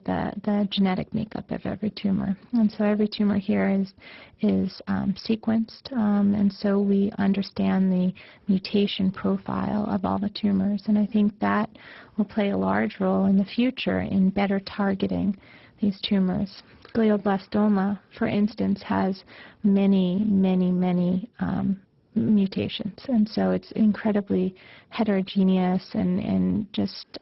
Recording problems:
garbled, watery; badly; nothing above 5.5 kHz

